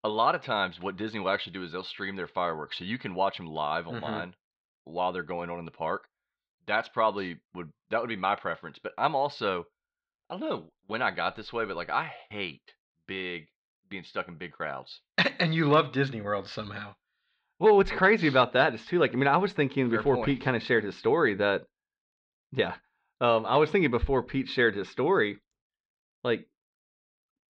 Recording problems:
muffled; slightly; fading above 4 kHz

